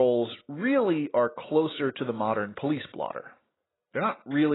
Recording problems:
garbled, watery; badly; nothing above 4 kHz
abrupt cut into speech; at the start and the end

